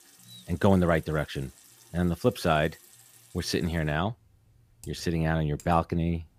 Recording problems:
household noises; faint; throughout; 25 dB below the speech

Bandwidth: 15 kHz